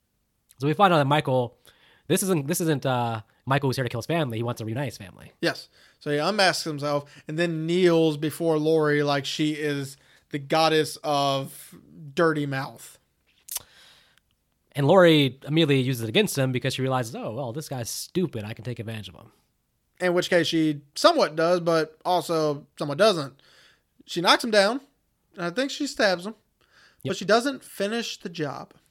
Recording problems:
uneven, jittery; strongly; from 2 to 28 s

